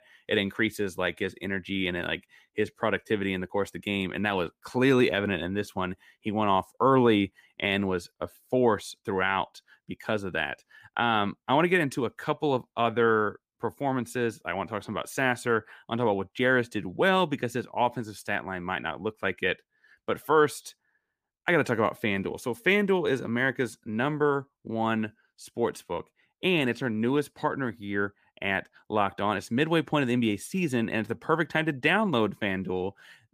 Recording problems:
none

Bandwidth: 15 kHz